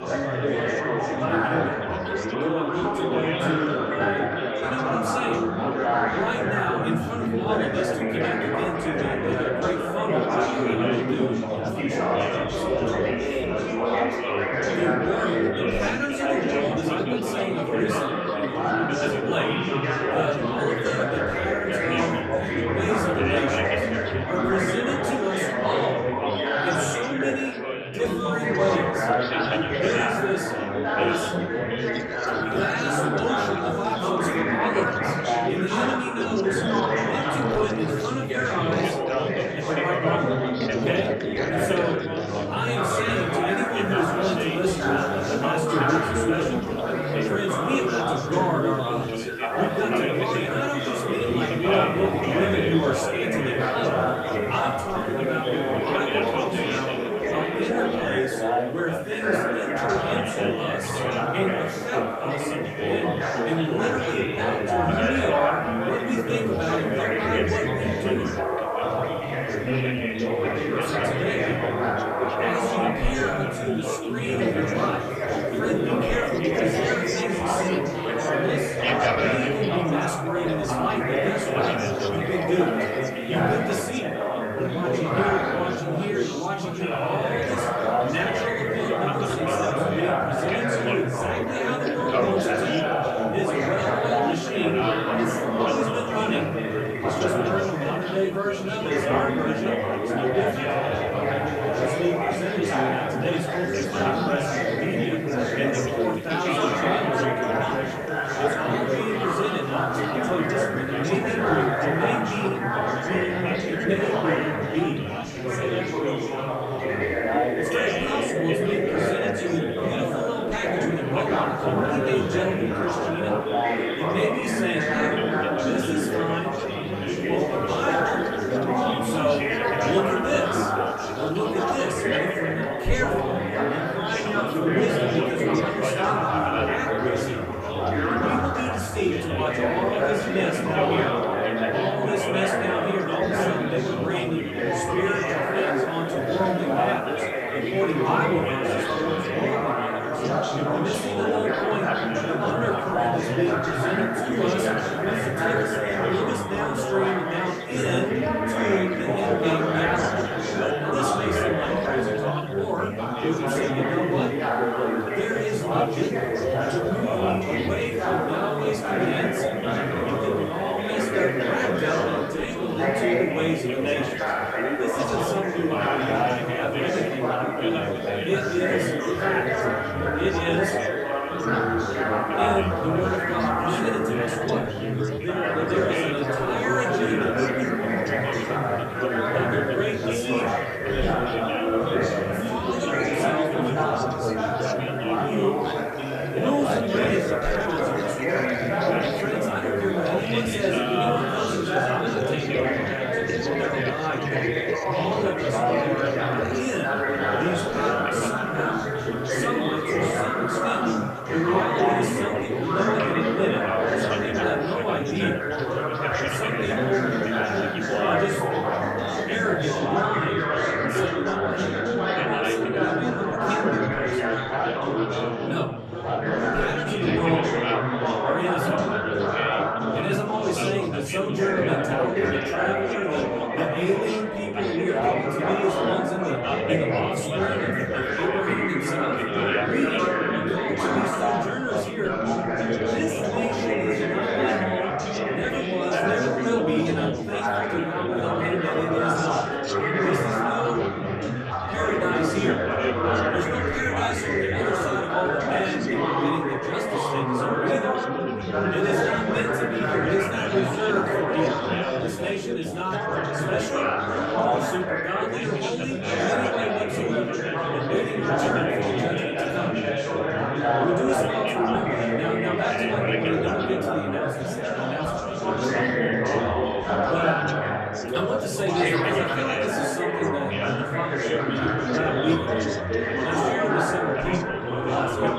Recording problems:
off-mic speech; far
room echo; slight; dies away in 0.3 s
chatter from many people; very loud; throughout; 4 dB above the speech
hiss; faint; from 43 s to 3:40; 25 dB below the speech

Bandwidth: 14.5 kHz